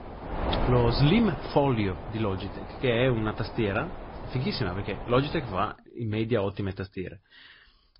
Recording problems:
garbled, watery; slightly; nothing above 5 kHz
high frequencies cut off; slight
wind noise on the microphone; heavy; until 5.5 s; 8 dB below the speech

